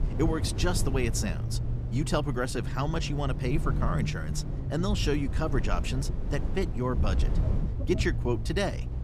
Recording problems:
low rumble; noticeable; throughout; 10 dB below the speech

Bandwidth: 14.5 kHz